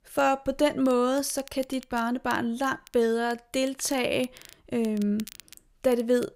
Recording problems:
crackle, like an old record; faint; 20 dB below the speech

